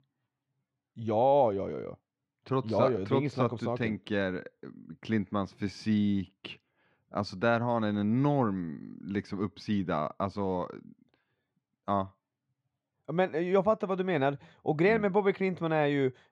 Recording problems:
muffled; slightly; fading above 3 kHz

